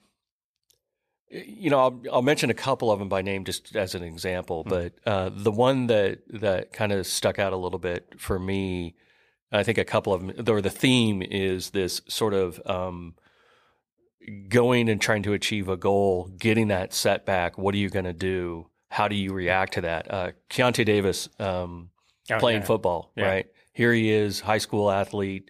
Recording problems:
none

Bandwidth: 15 kHz